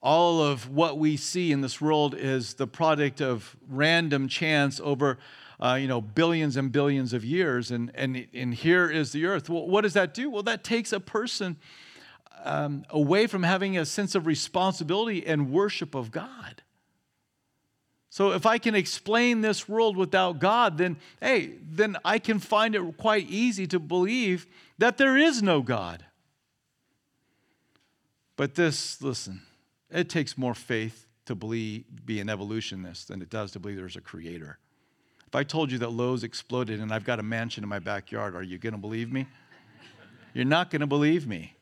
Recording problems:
none

